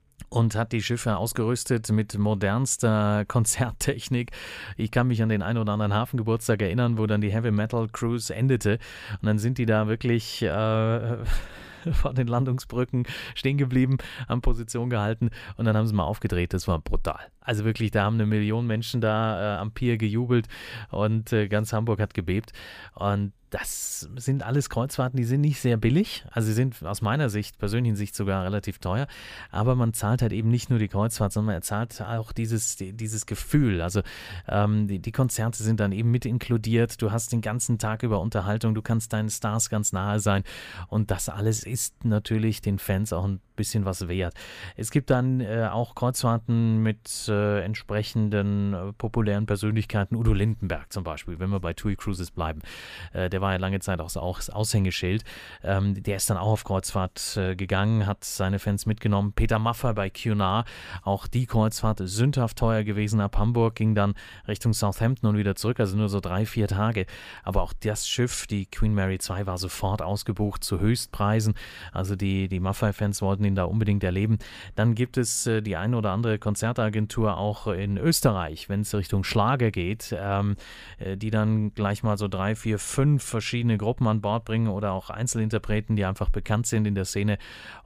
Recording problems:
none

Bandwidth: 15 kHz